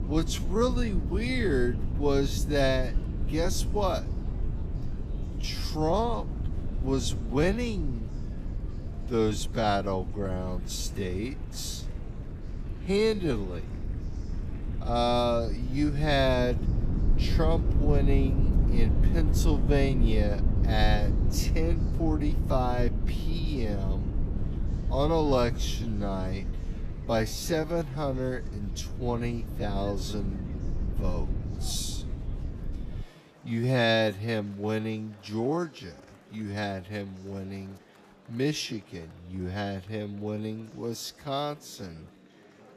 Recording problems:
wrong speed, natural pitch; too slow; 0.6 times normal speed
low rumble; noticeable; until 33 s; 15 dB below the speech
murmuring crowd; faint; throughout; 25 dB below the speech

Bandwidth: 14.5 kHz